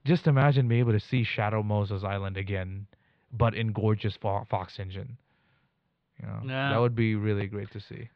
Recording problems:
muffled; slightly; fading above 4 kHz

